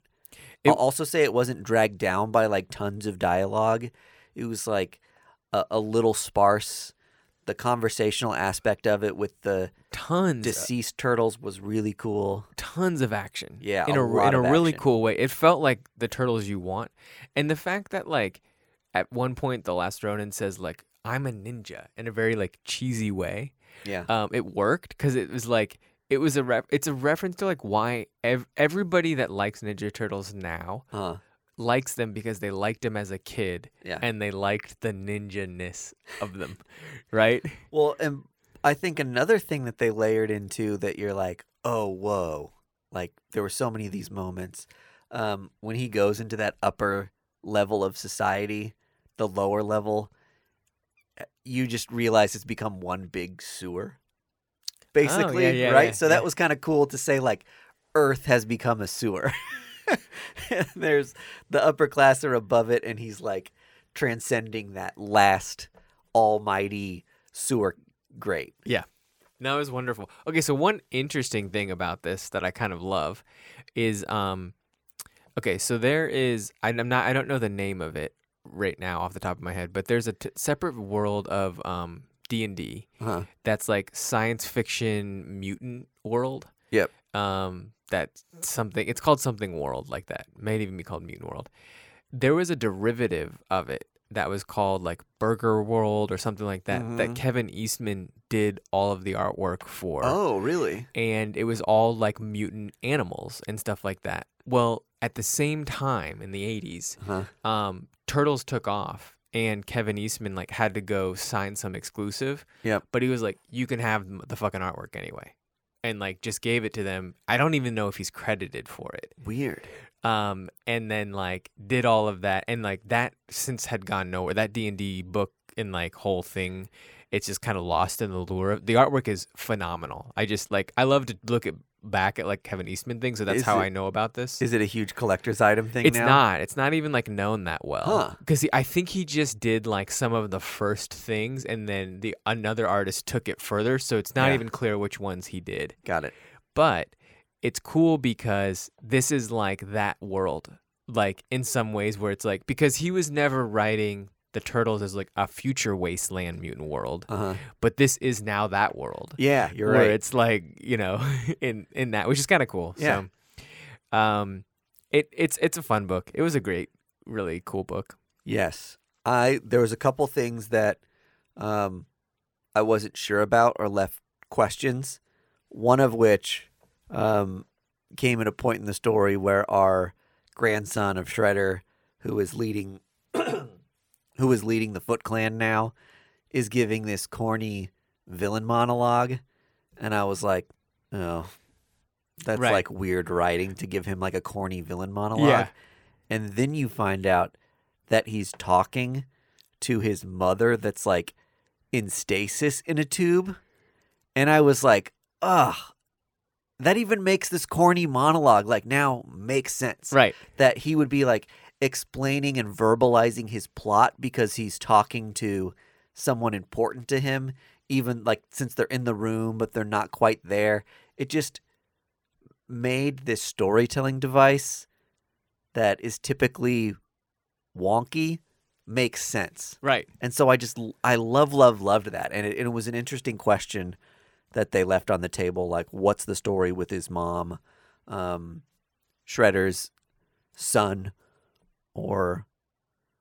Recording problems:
none

